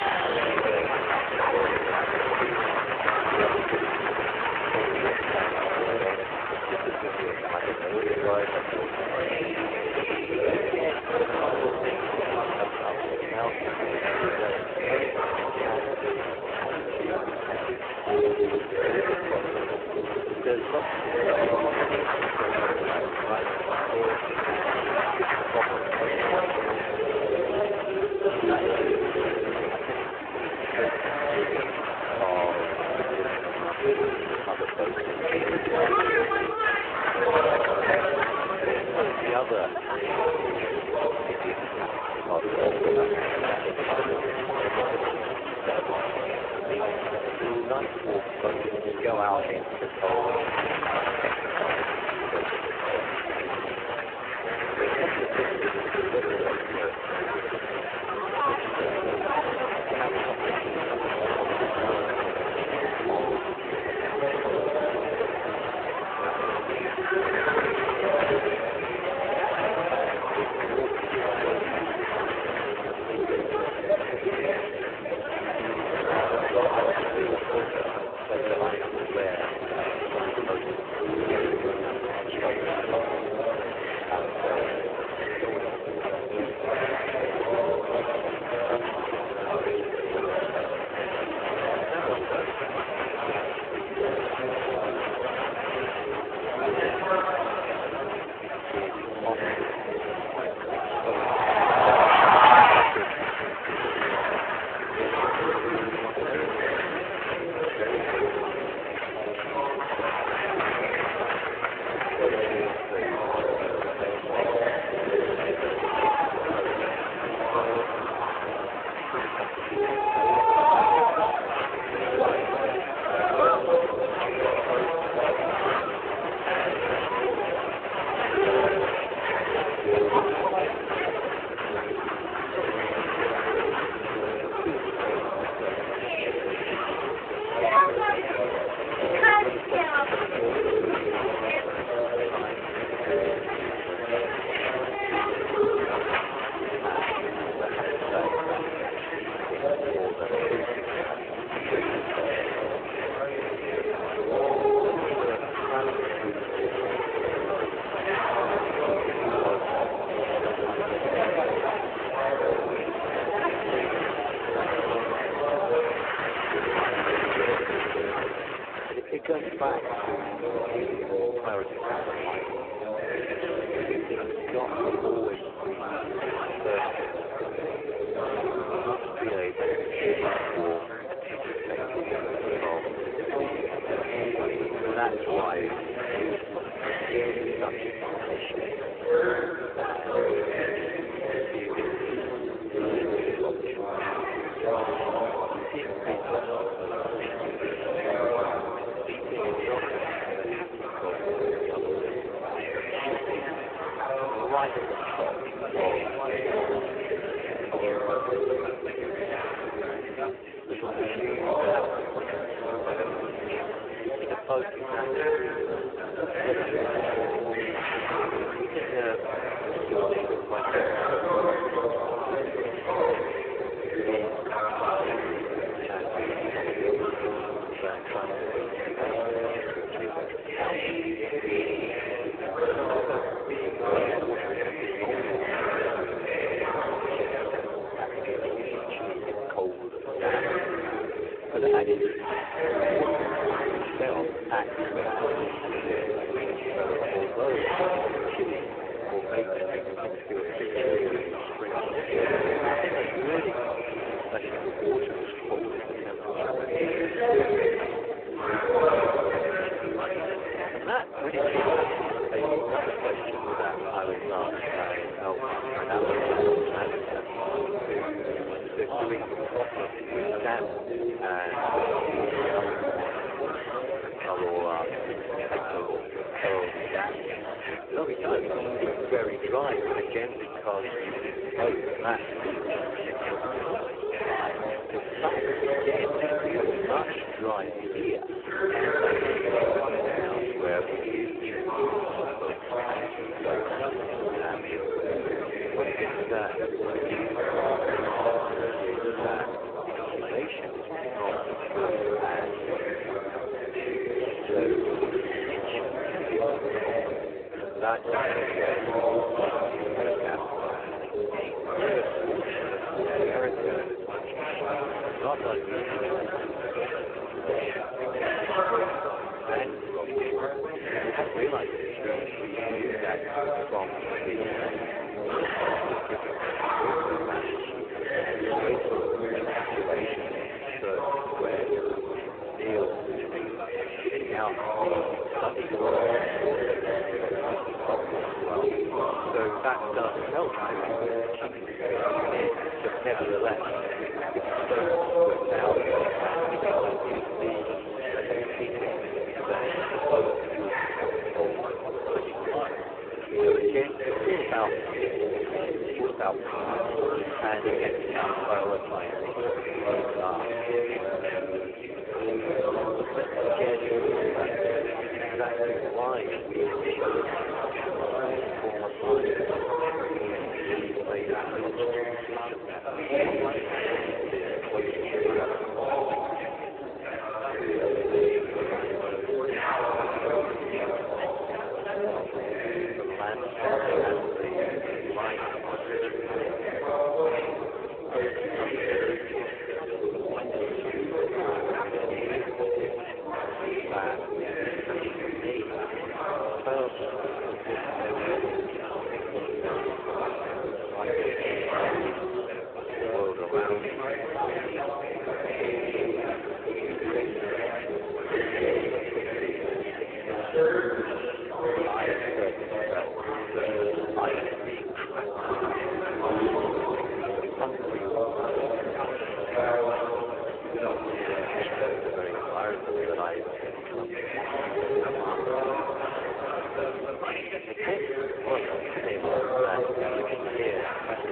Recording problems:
phone-call audio; poor line
chatter from many people; very loud; throughout; 6 dB above the speech
traffic noise; faint; until 3:03; 20 dB below the speech

